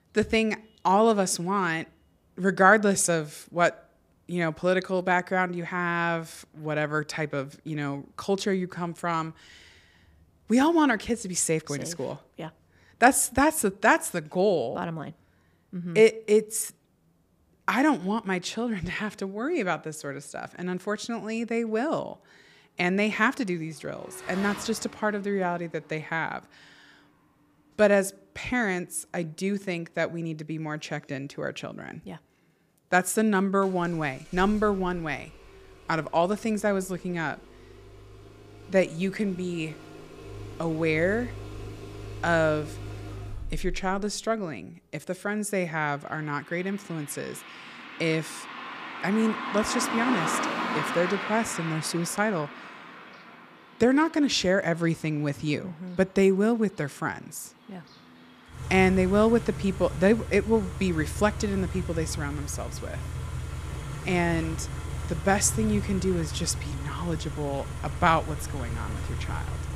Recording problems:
traffic noise; loud; throughout; 9 dB below the speech

